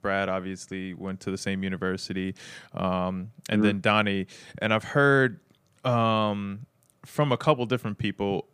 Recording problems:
none

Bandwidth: 15 kHz